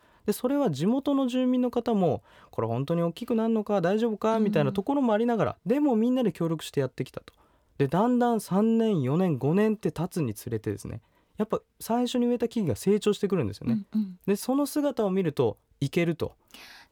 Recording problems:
none

